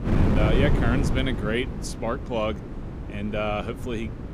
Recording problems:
wind noise on the microphone; heavy; 6 dB below the speech

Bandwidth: 15 kHz